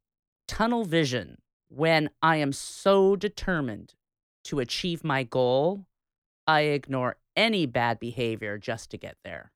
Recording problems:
none

